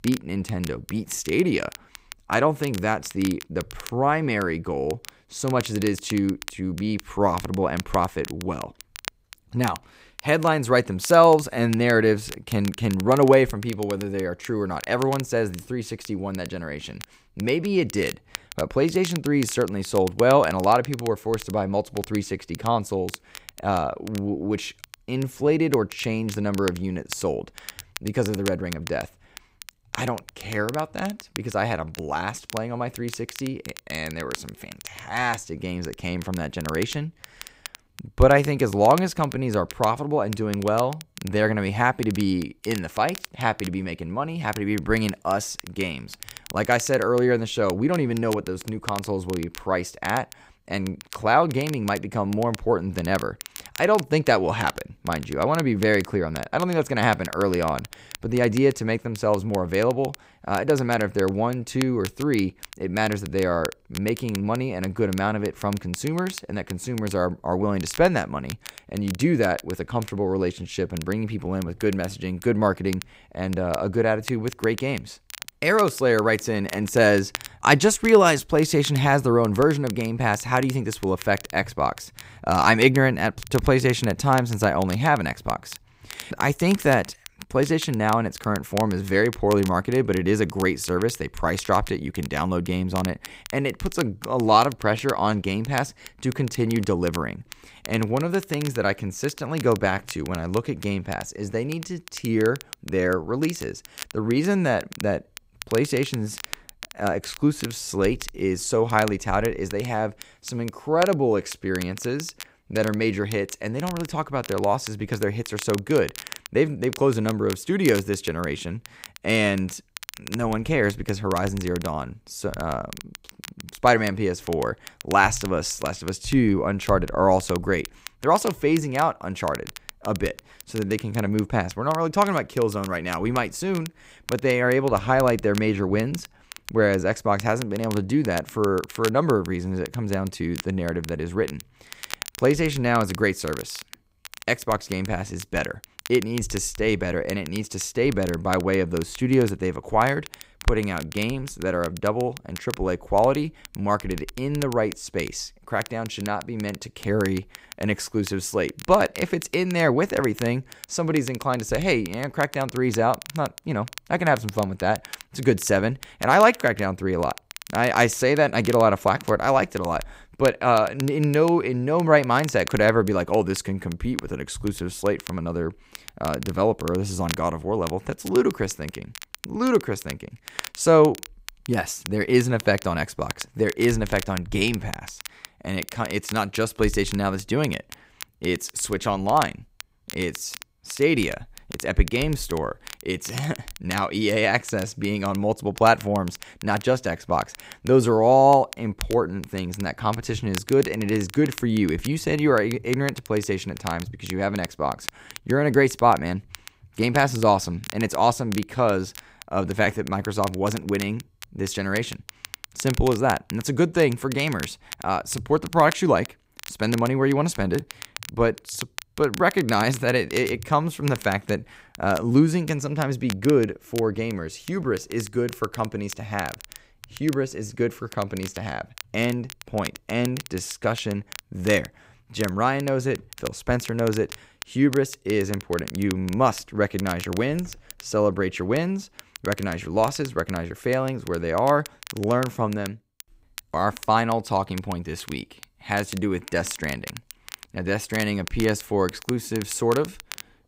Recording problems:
crackle, like an old record; noticeable; 15 dB below the speech

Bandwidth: 15.5 kHz